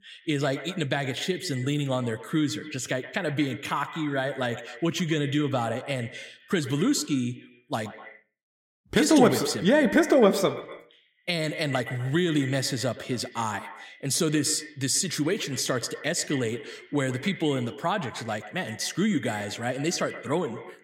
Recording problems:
echo of what is said; noticeable; throughout; 120 ms later, 15 dB below the speech

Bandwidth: 16 kHz